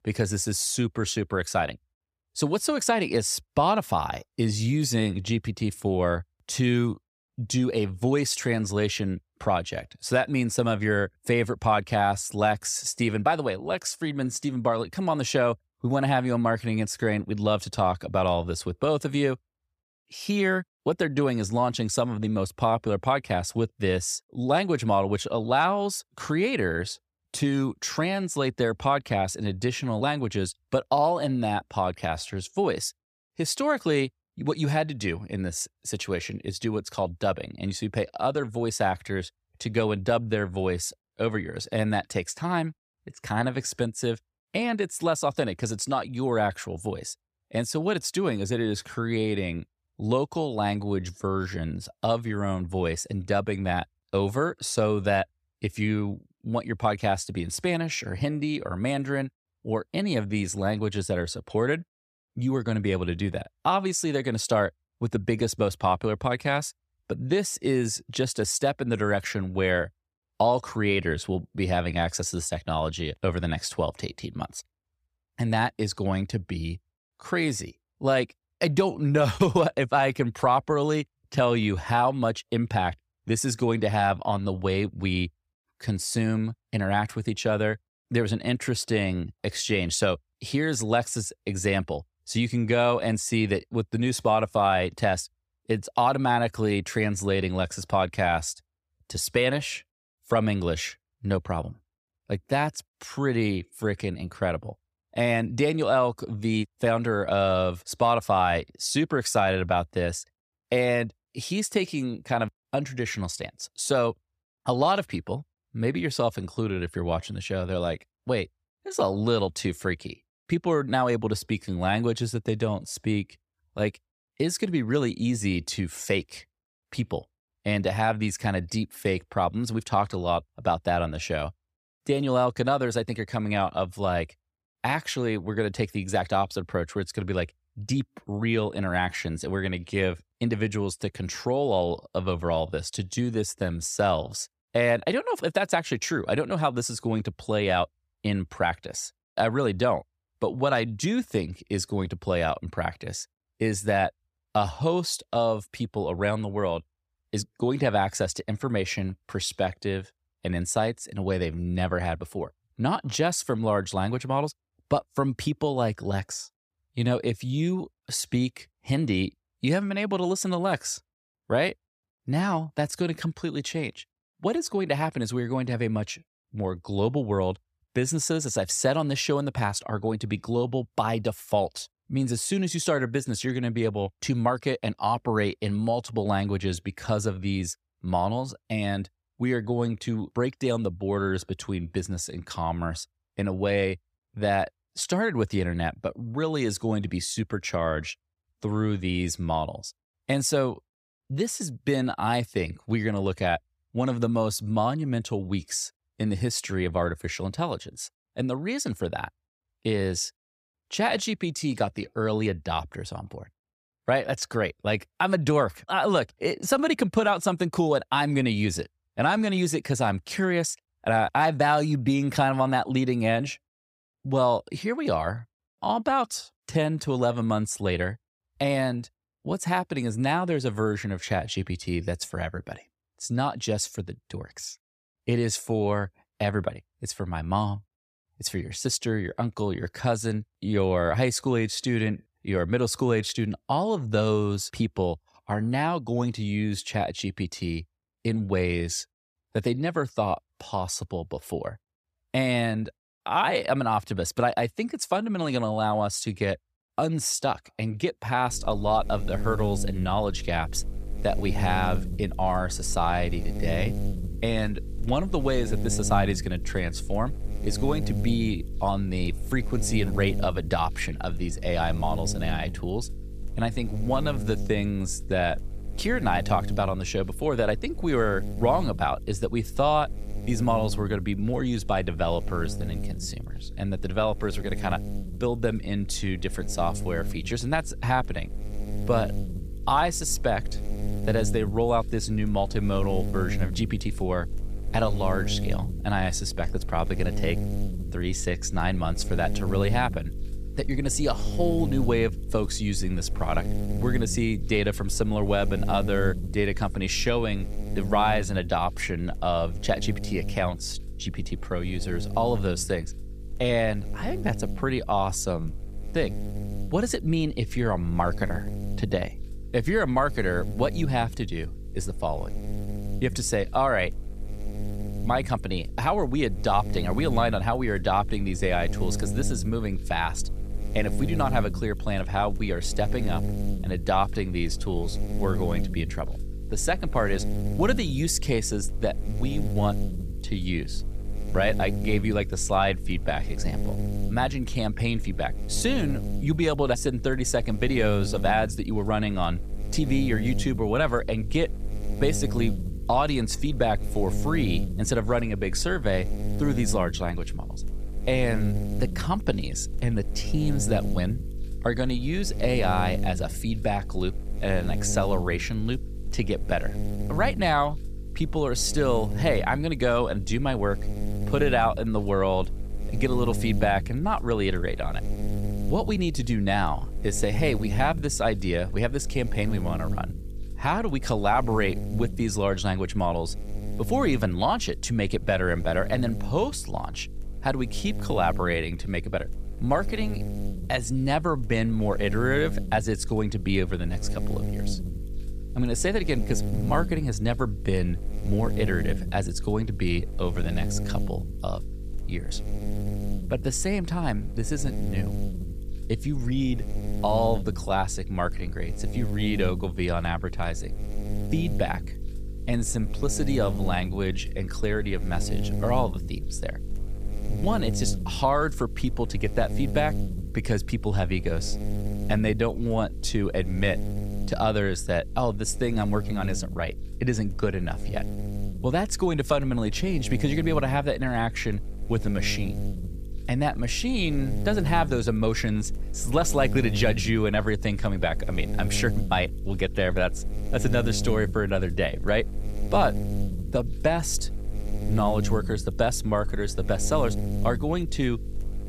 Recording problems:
electrical hum; noticeable; from 4:18 on; 50 Hz, 15 dB below the speech

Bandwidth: 15 kHz